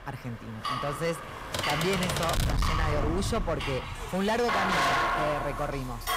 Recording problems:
distortion; heavy; 15% of the sound clipped
household noises; very loud; throughout; 1 dB above the speech
traffic noise; loud; throughout; 9 dB below the speech
keyboard typing; loud; from 1.5 to 2.5 s; peak 1 dB above the speech

